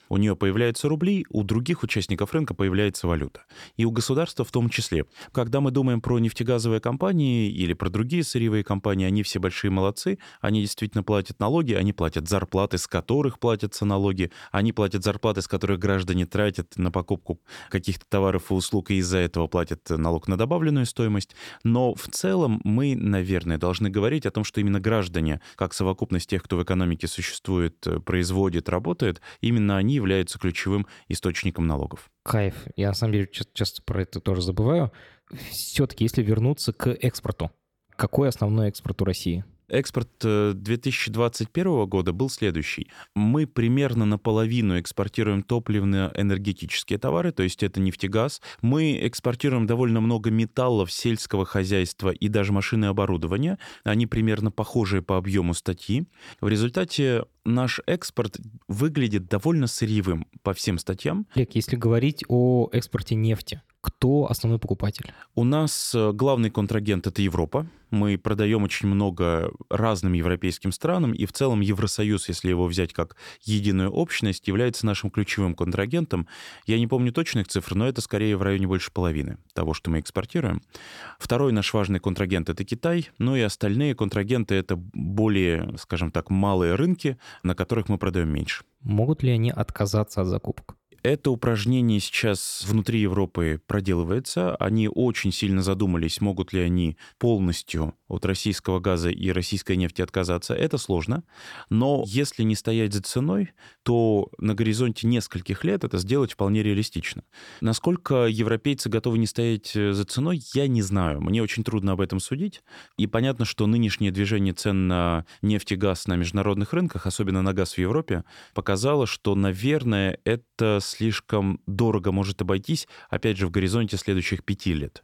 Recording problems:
none

